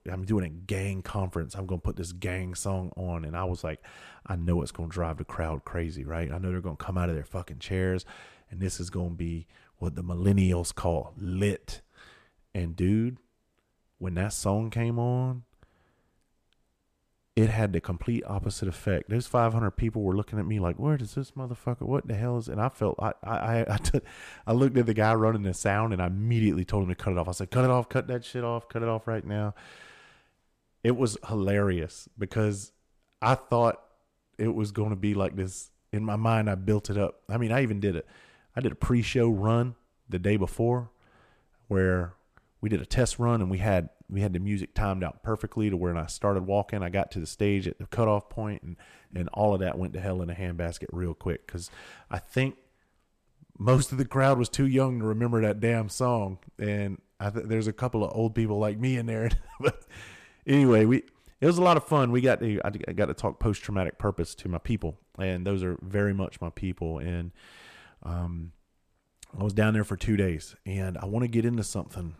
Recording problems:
none

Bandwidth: 14.5 kHz